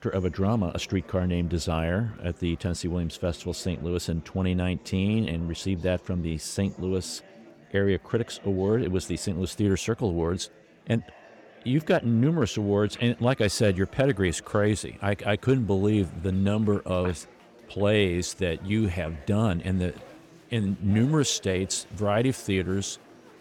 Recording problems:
murmuring crowd; faint; throughout; 25 dB below the speech

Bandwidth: 18.5 kHz